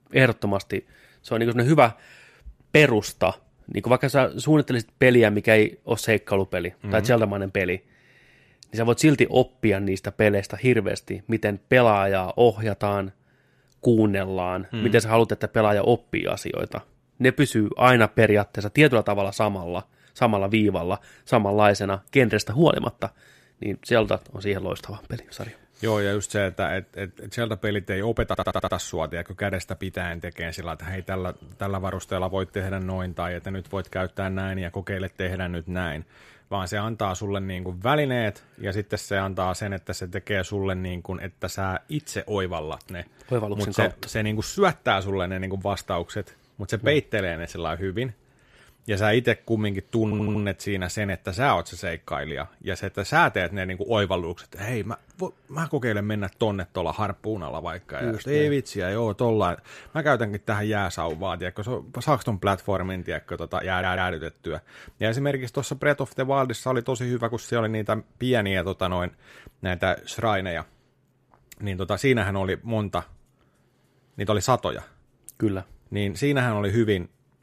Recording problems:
audio stuttering; at 28 s, at 50 s and at 1:04

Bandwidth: 14.5 kHz